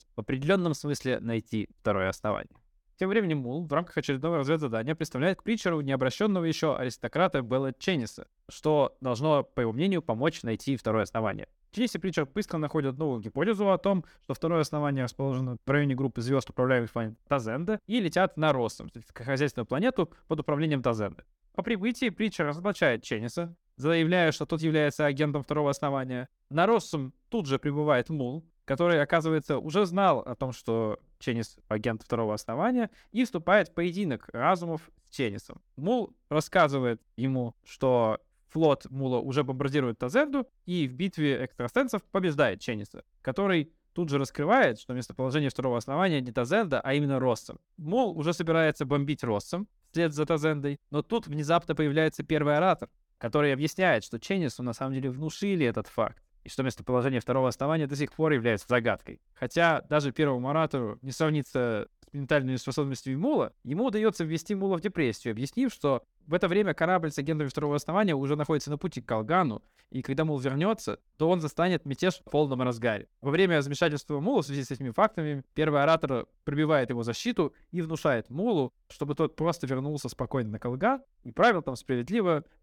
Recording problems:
none

